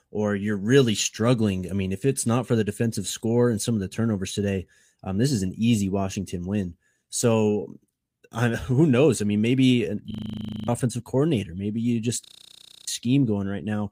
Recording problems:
audio freezing; at 10 s for 0.5 s and at 12 s for 0.5 s

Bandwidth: 15.5 kHz